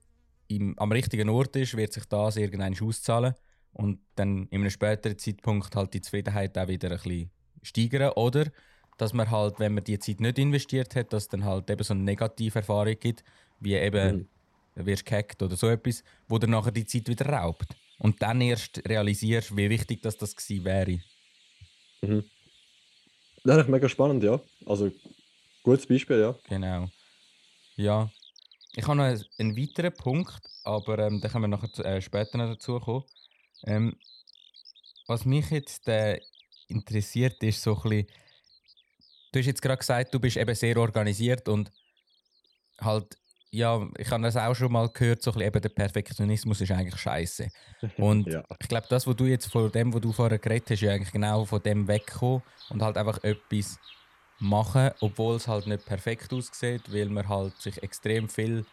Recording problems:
animal sounds; faint; throughout; 25 dB below the speech

